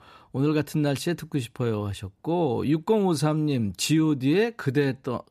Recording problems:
none

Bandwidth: 14.5 kHz